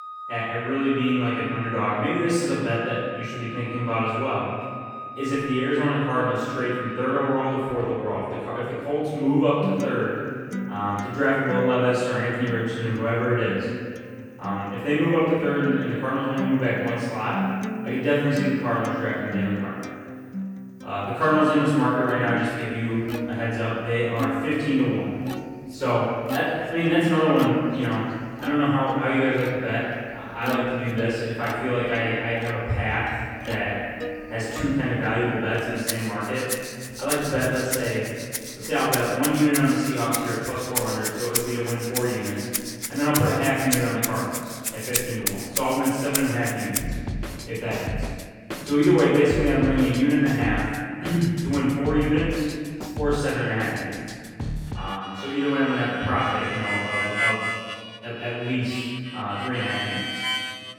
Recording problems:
room echo; strong; dies away in 2 s
off-mic speech; far
background music; loud; throughout; 8 dB below the speech

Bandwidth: 18 kHz